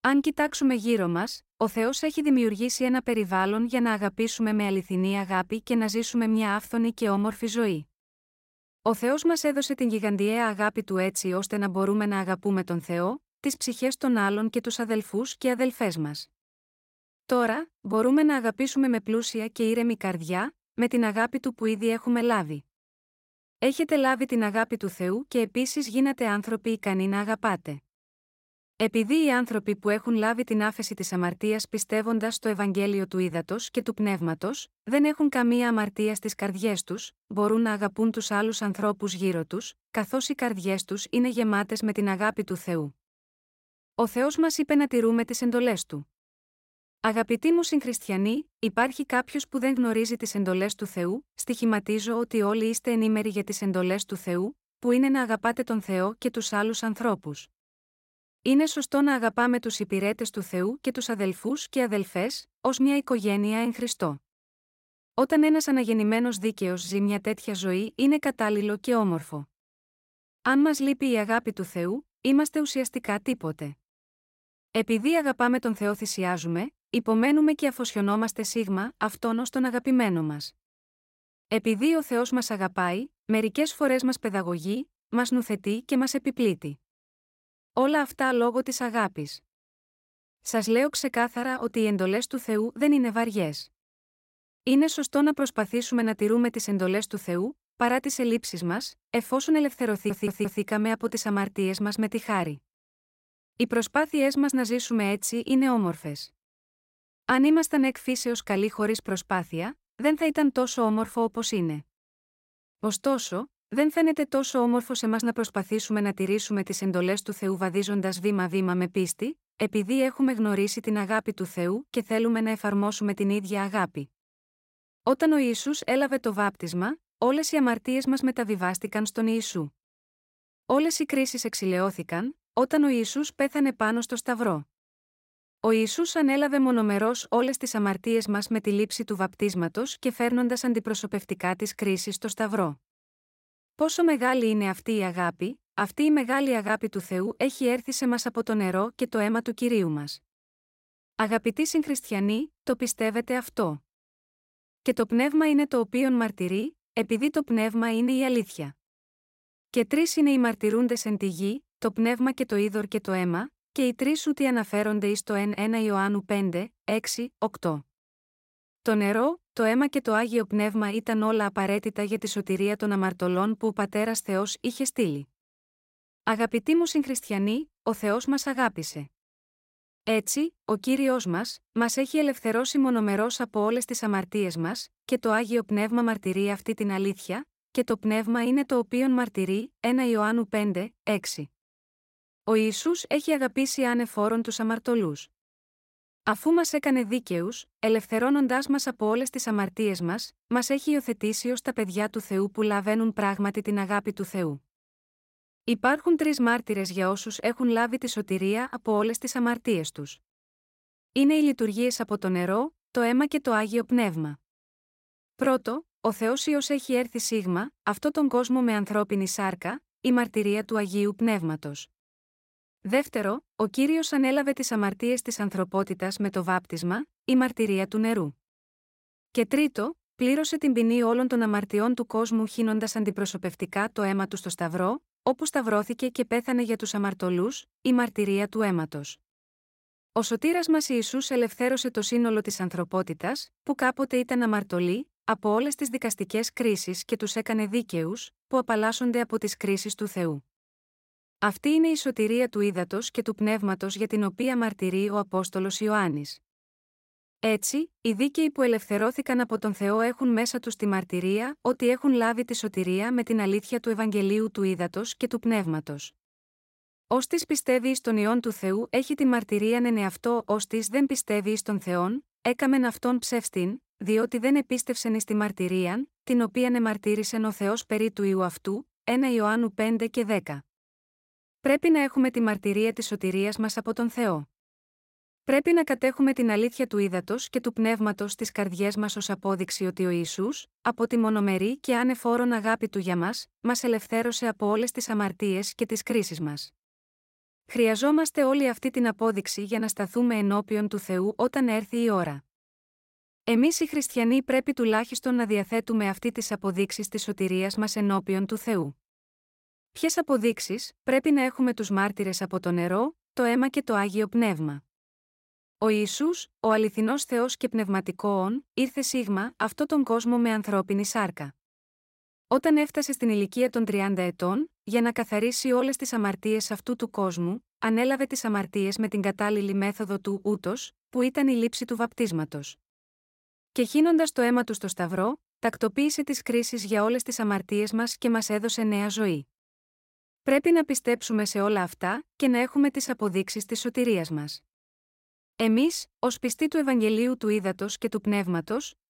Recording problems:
audio stuttering; at 1:40

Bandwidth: 16 kHz